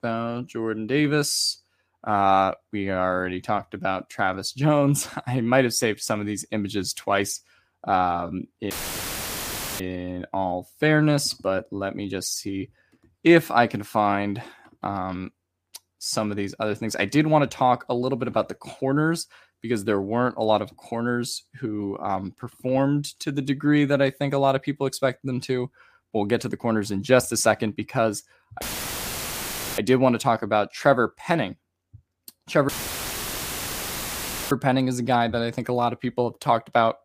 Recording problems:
audio cutting out; filled with static; at 8.5 s for 1 s, at 29 s for 1 s and at 33 s for 2 s

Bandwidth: 15 kHz